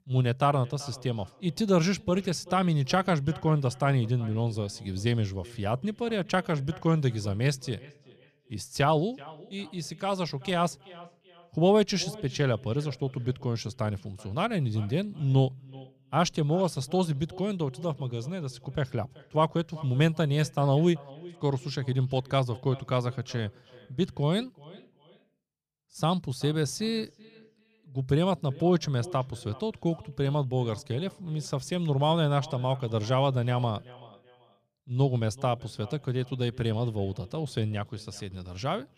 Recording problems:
echo of what is said; faint; throughout; 380 ms later, 20 dB below the speech

